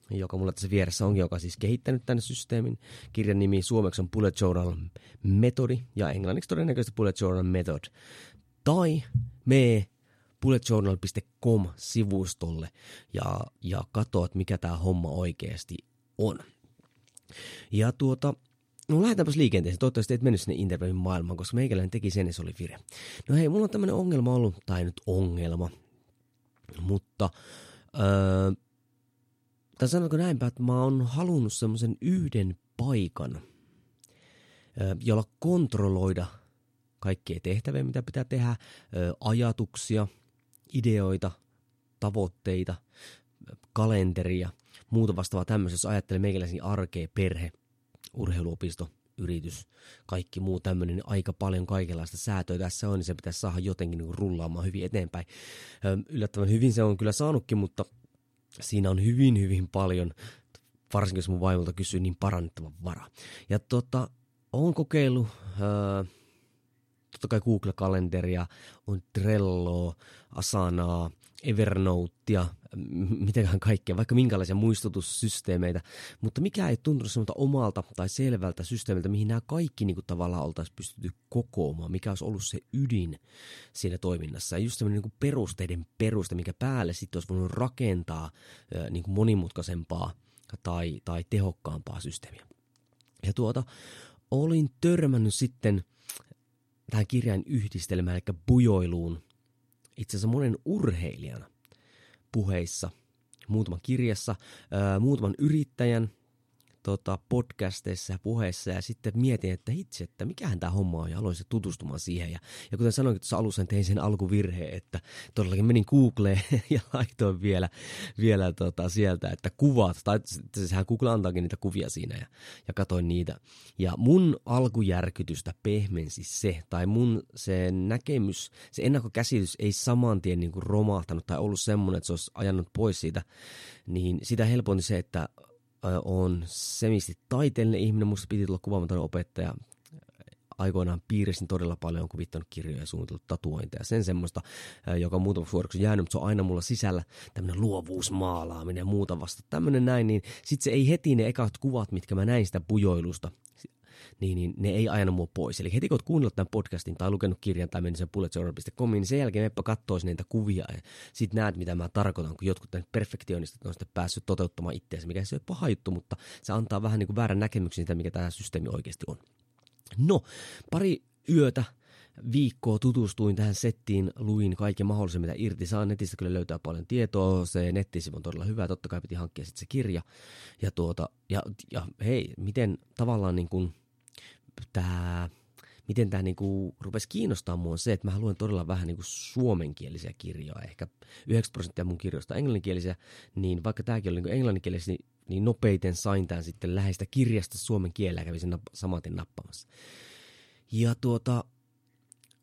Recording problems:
none

